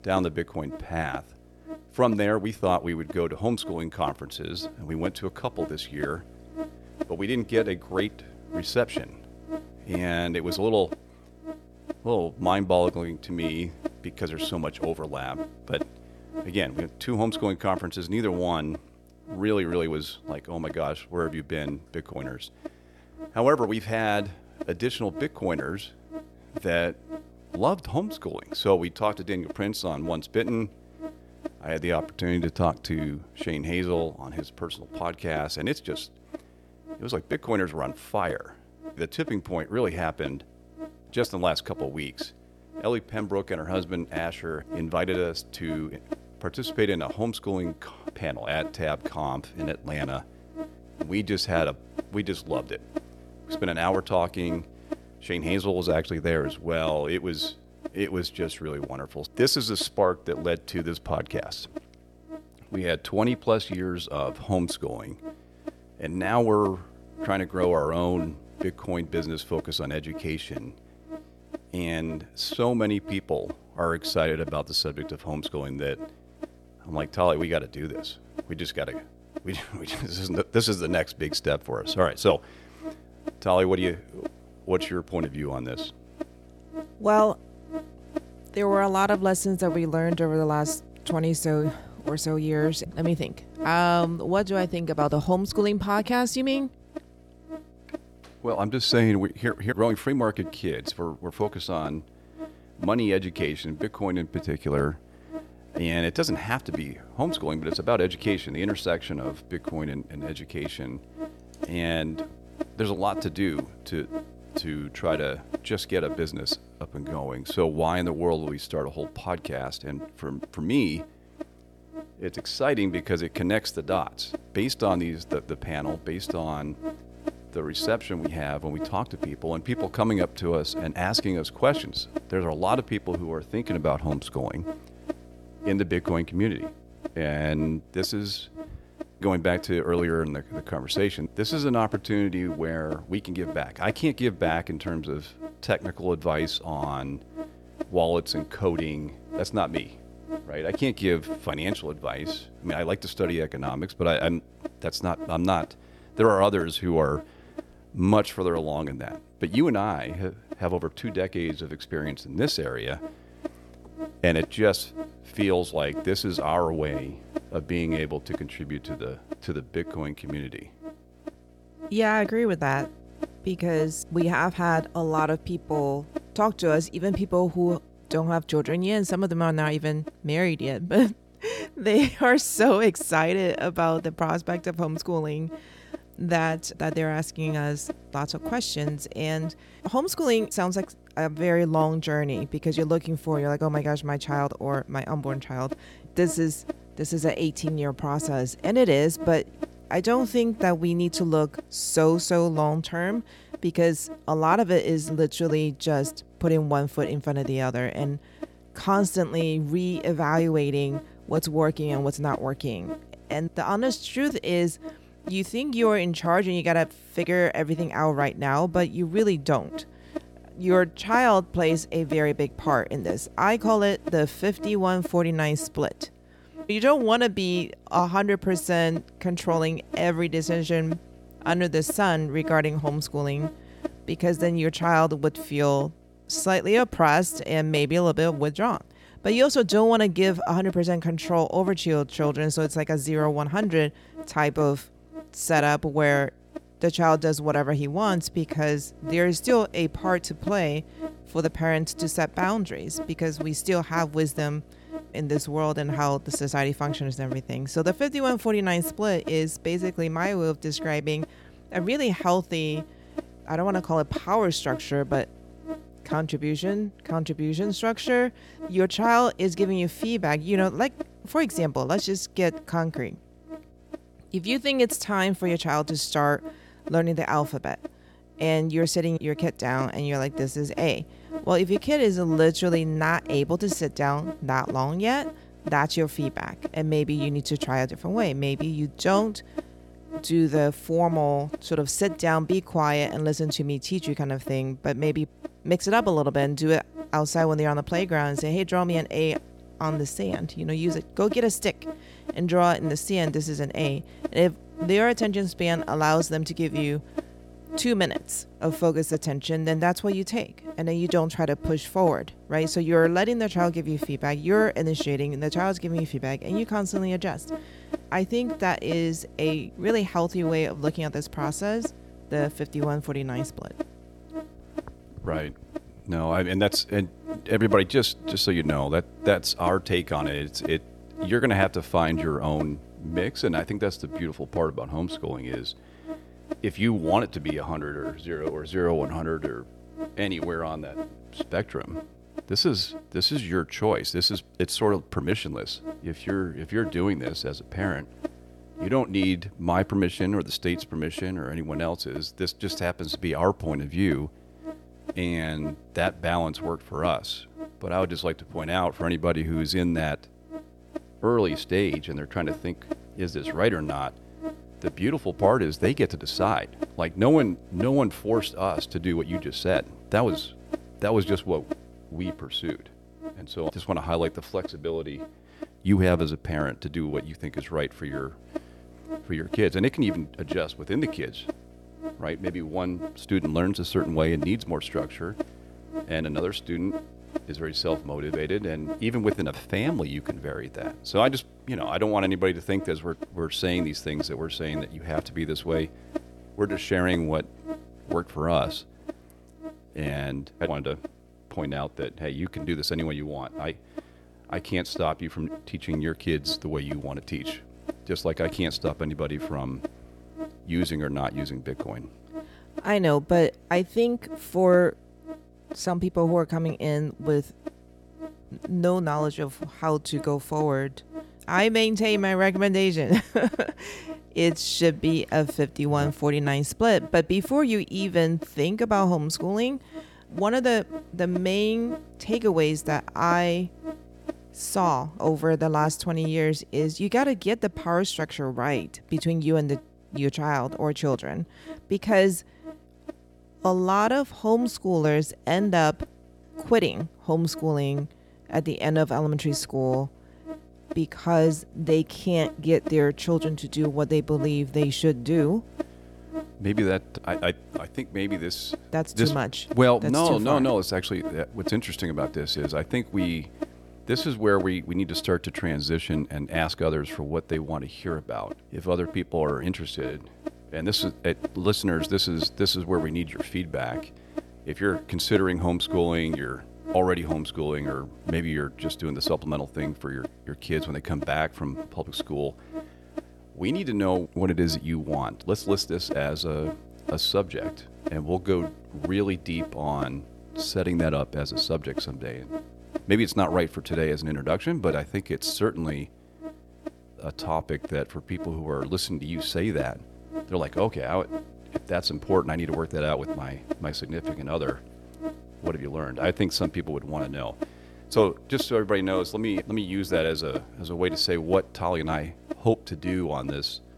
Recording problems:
electrical hum; noticeable; throughout; 60 Hz, 15 dB below the speech

